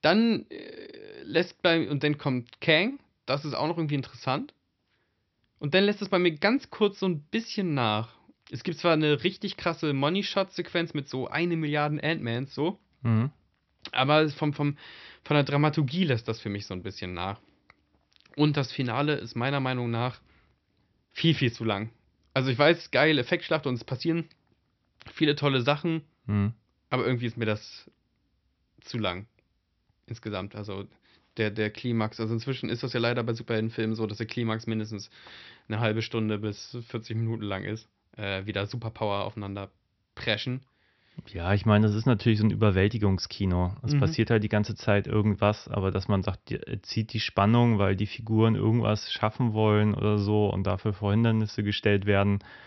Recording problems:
high frequencies cut off; noticeable; nothing above 5.5 kHz

